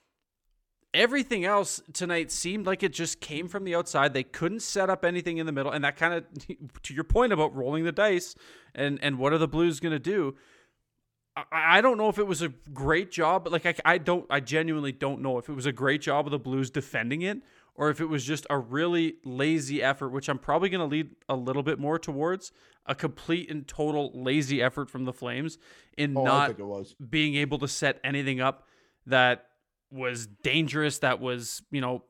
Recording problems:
none

